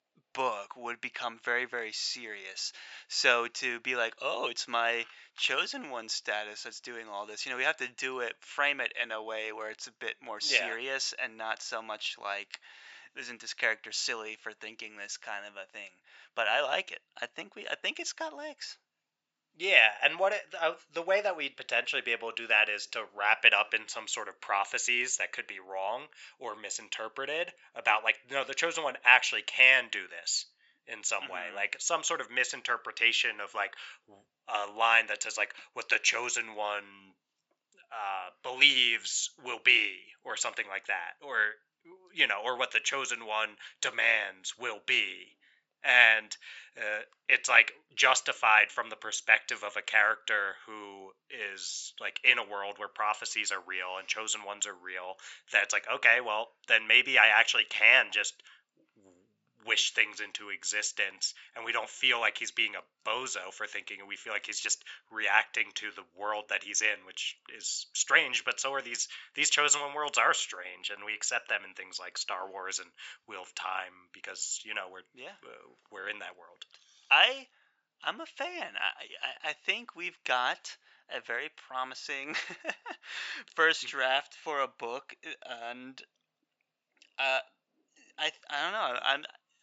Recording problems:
thin; very; fading below 850 Hz
high frequencies cut off; noticeable; nothing above 8 kHz

